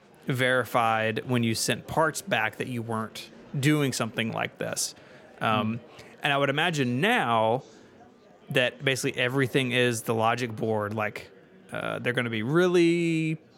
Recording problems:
murmuring crowd; faint; throughout; 25 dB below the speech

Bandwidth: 16.5 kHz